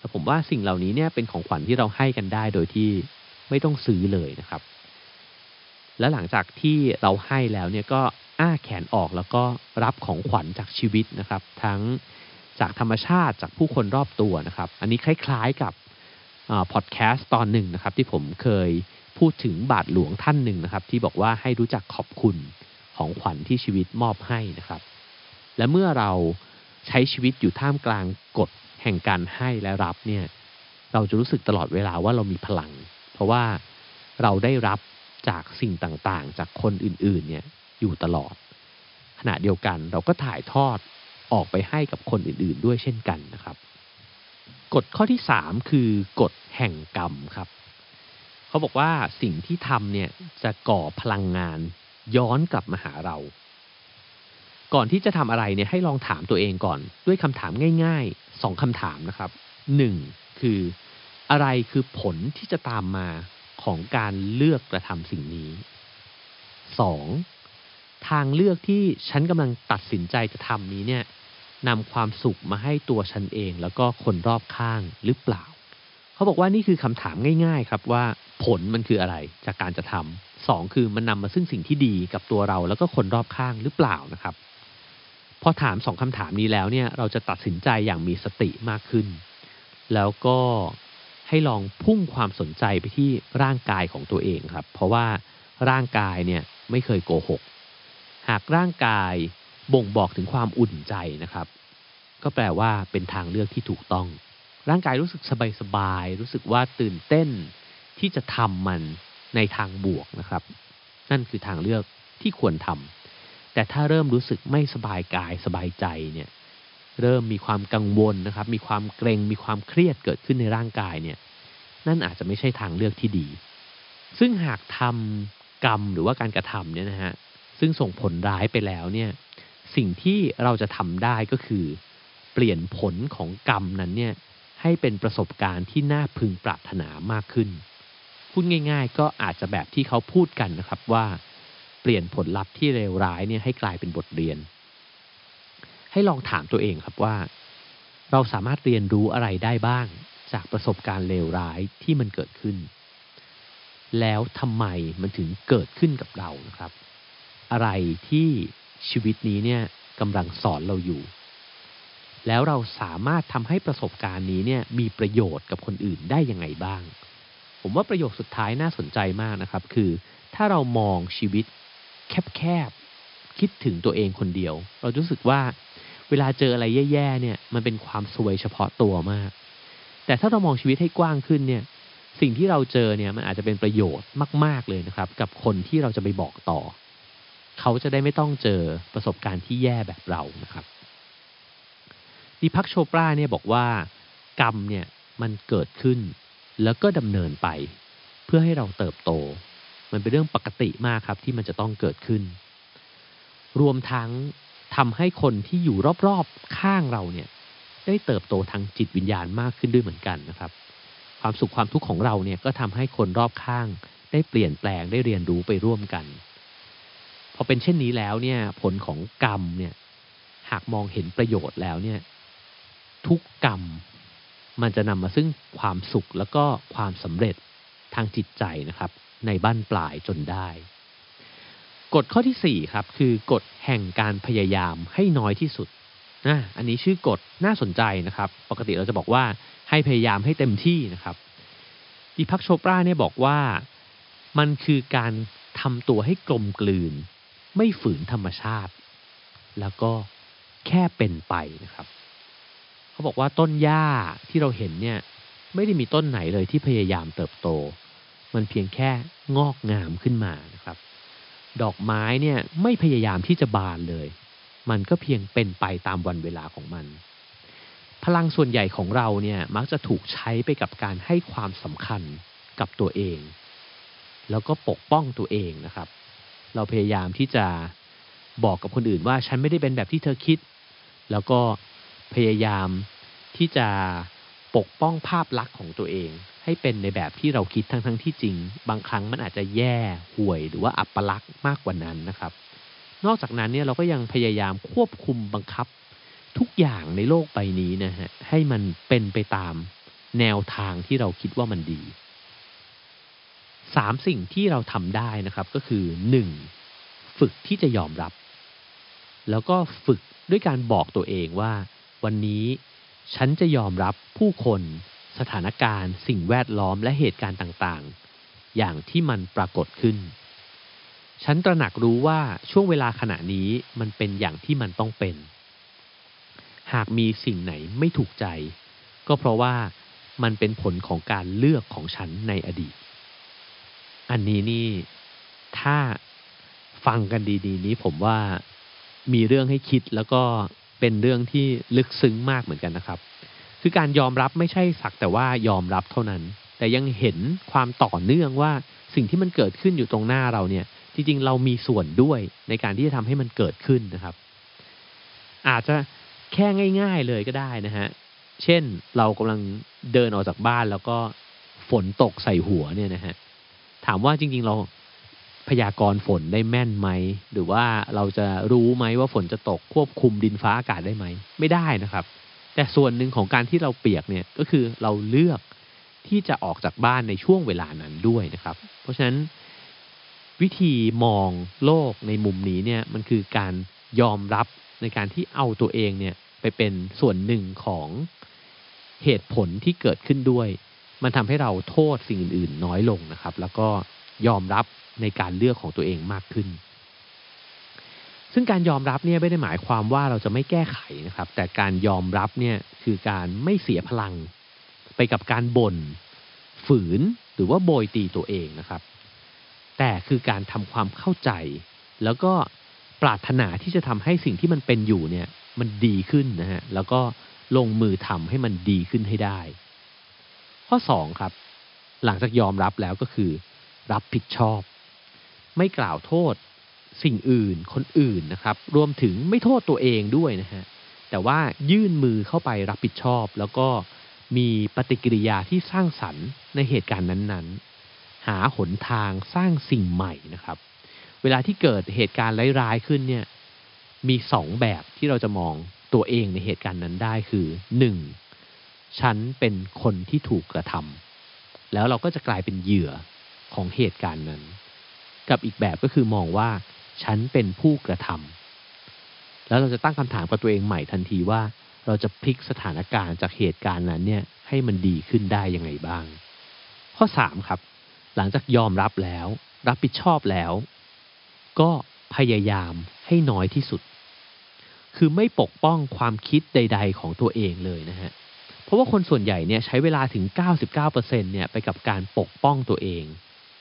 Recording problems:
high frequencies cut off; noticeable; nothing above 5.5 kHz
hiss; faint; throughout; 25 dB below the speech

